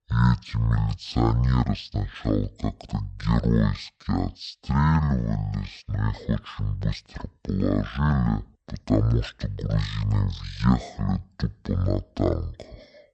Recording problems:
wrong speed and pitch; too slow and too low; 0.5 times normal speed

